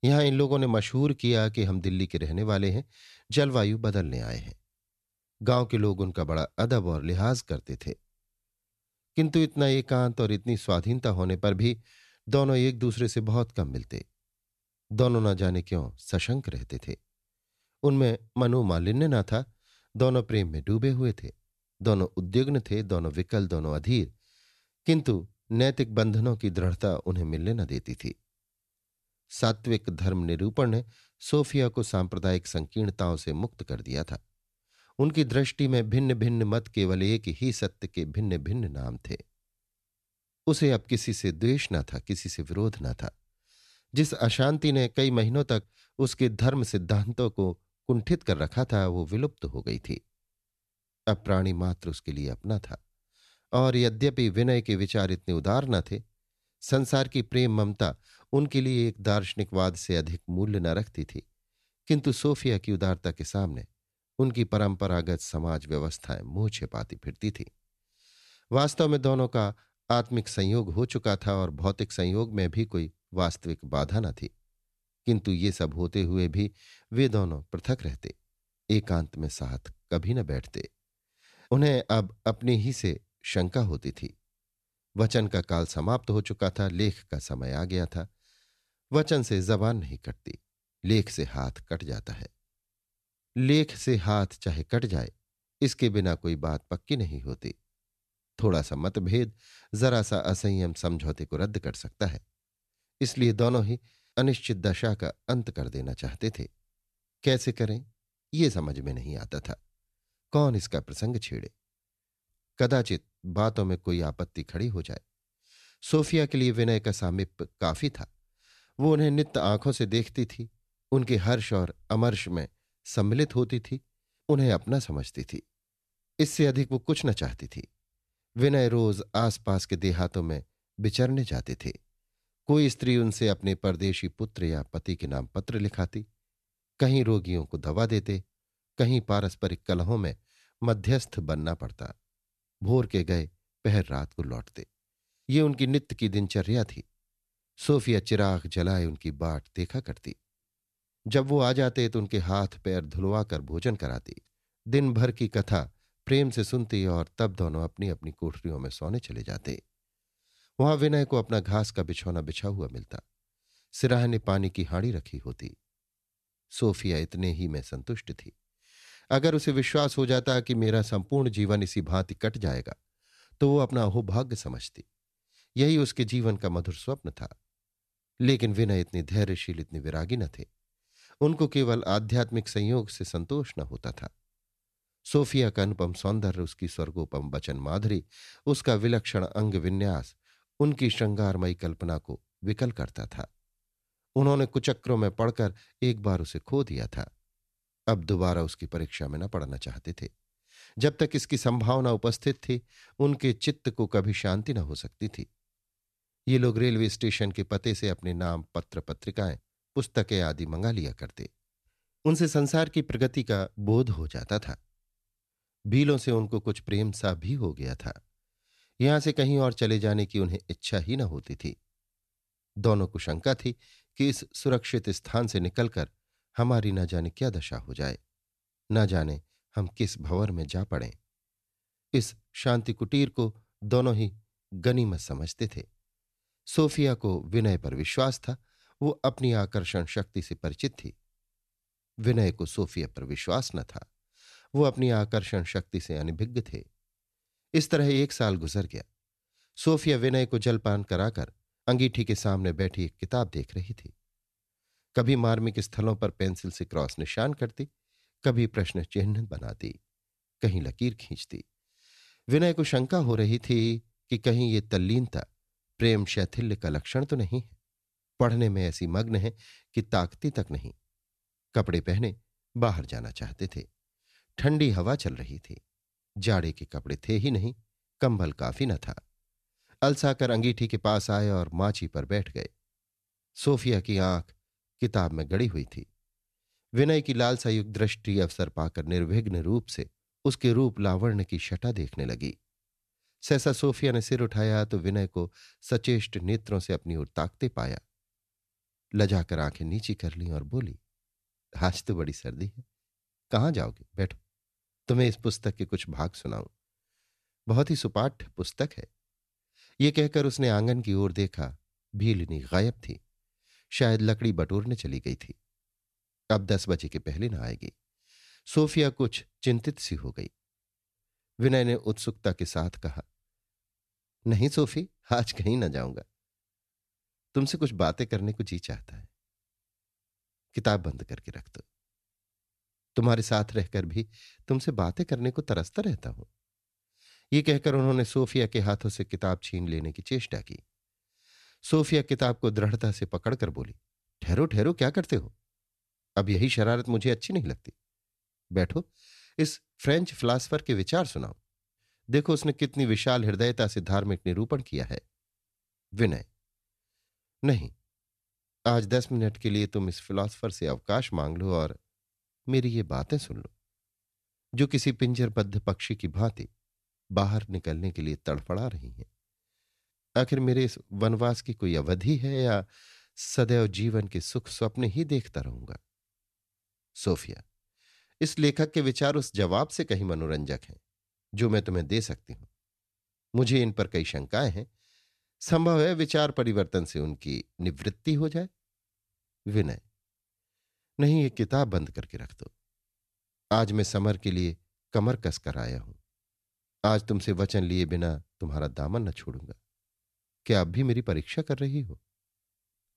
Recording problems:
none

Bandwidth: 13.5 kHz